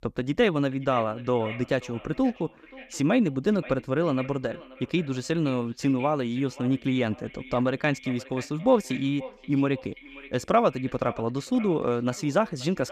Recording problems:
echo of what is said; noticeable; throughout; 530 ms later, 20 dB below the speech

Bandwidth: 14.5 kHz